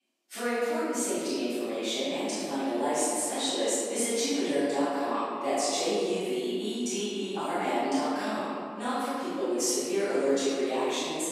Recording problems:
room echo; strong; dies away in 2.2 s
off-mic speech; far
thin; very slightly; fading below 300 Hz

